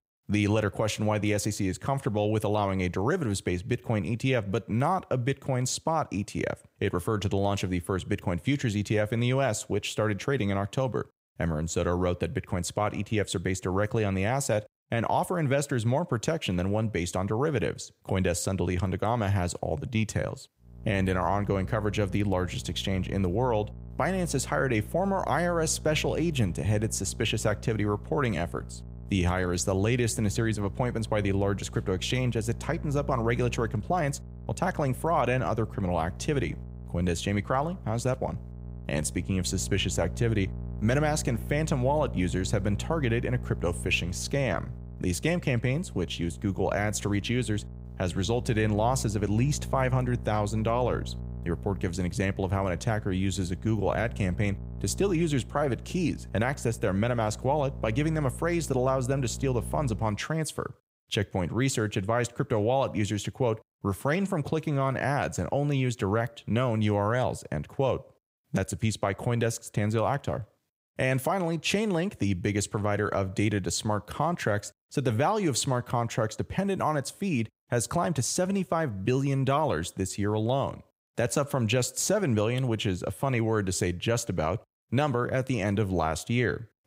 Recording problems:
electrical hum; faint; from 21 s to 1:00; 60 Hz, 20 dB below the speech

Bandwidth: 15.5 kHz